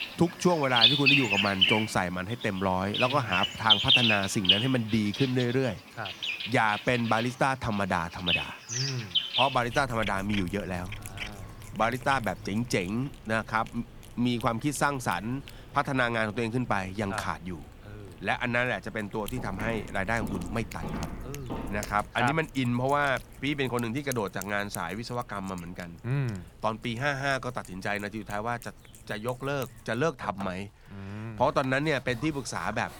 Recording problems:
animal sounds; very loud; throughout; 2 dB above the speech
footsteps; noticeable; from 19 to 22 s; peak 7 dB below the speech

